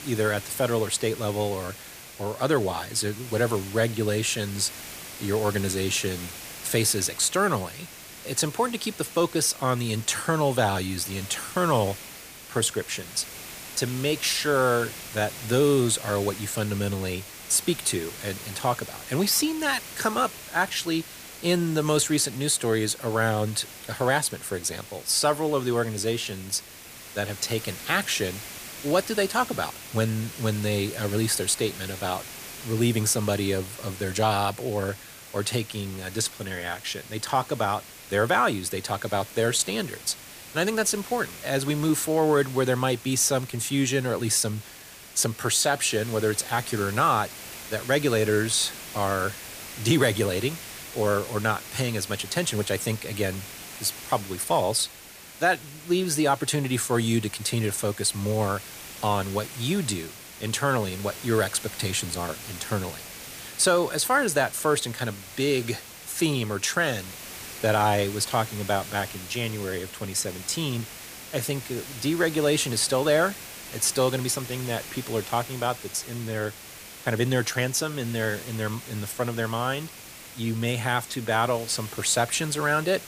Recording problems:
hiss; noticeable; throughout; 15 dB below the speech

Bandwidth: 15 kHz